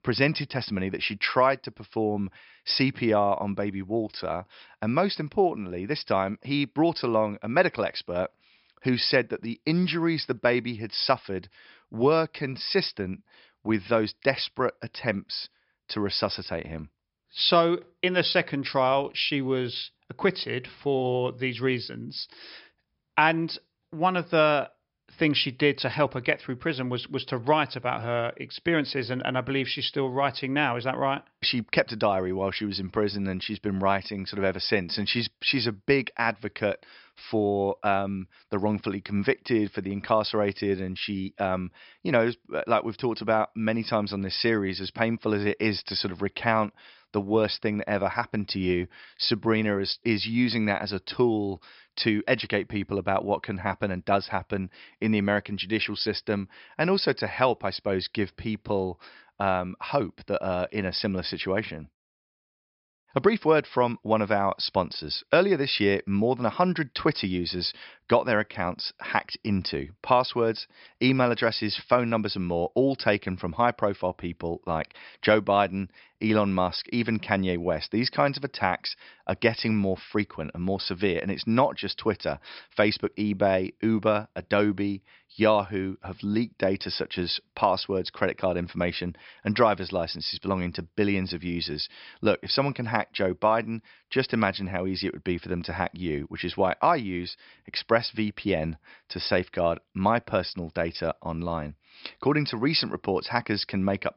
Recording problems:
high frequencies cut off; noticeable; nothing above 5.5 kHz

